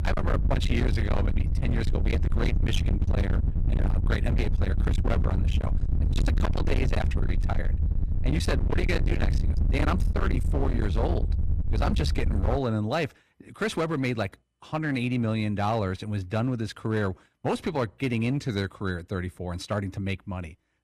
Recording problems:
distortion; heavy; 34% of the sound clipped
low rumble; loud; until 13 s; 6 dB below the speech

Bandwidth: 14.5 kHz